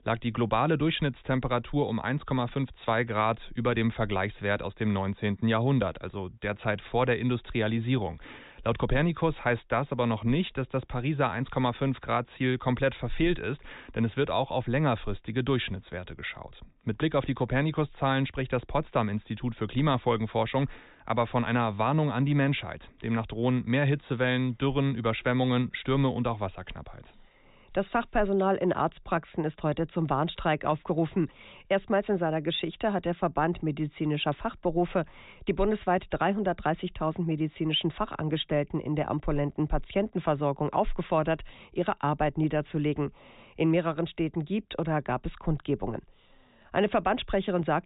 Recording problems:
high frequencies cut off; severe; nothing above 4 kHz

